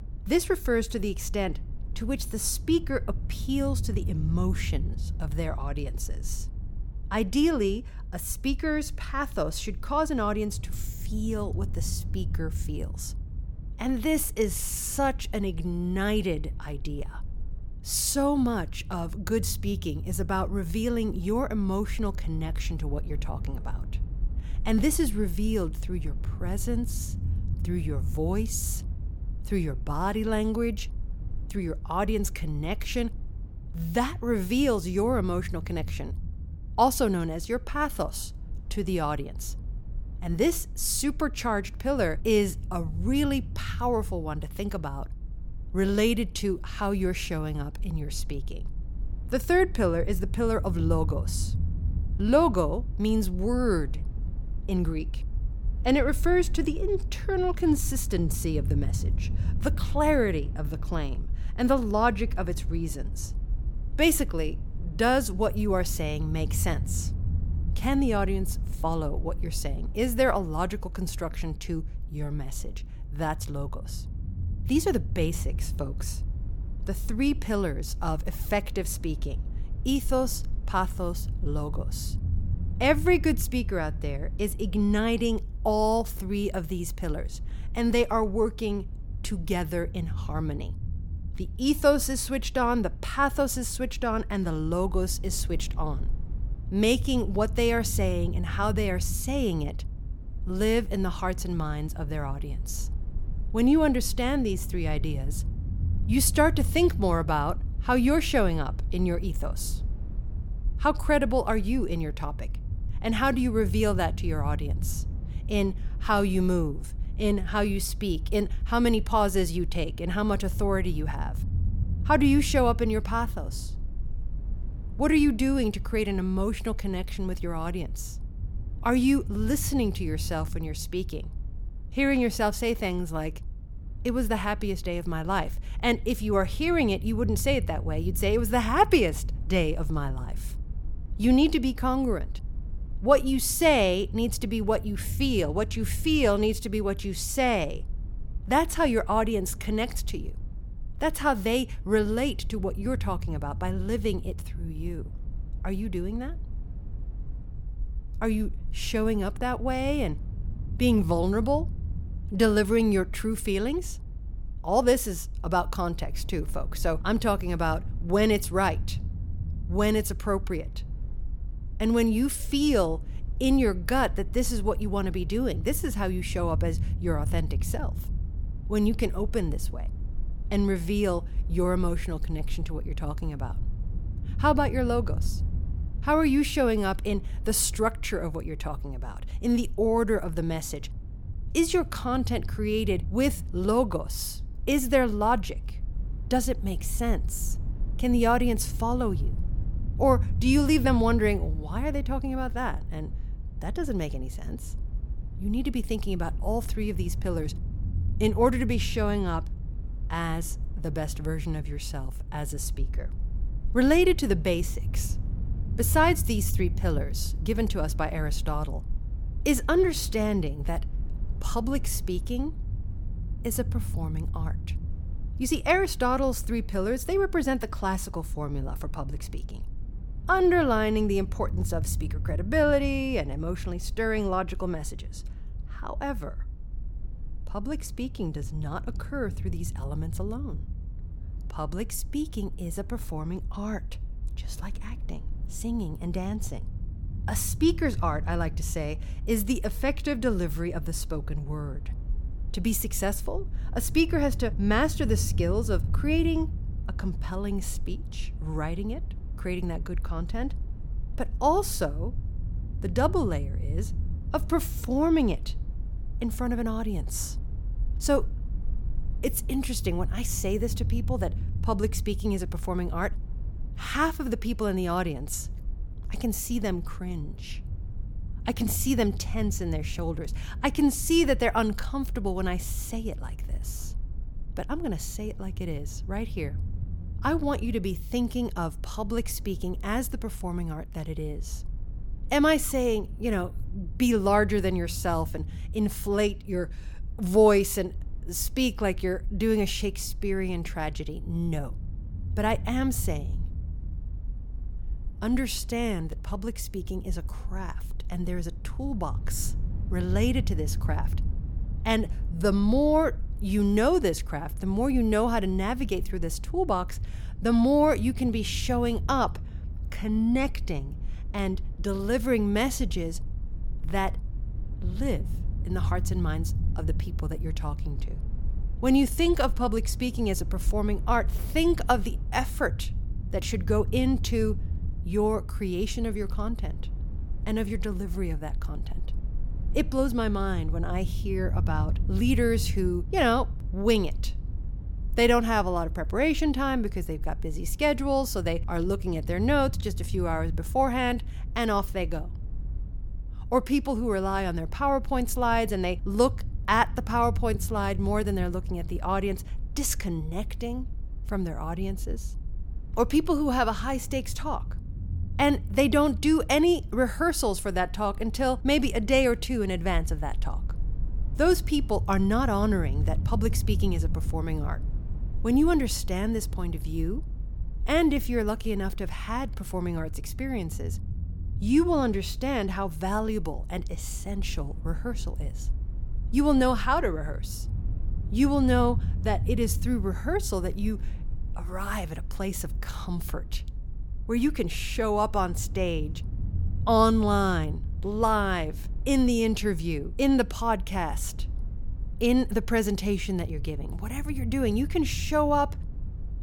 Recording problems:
low rumble; faint; throughout; 20 dB below the speech

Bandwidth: 17.5 kHz